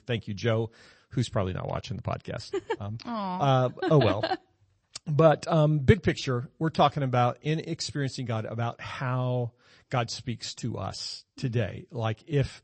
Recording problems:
garbled, watery; slightly; nothing above 8 kHz

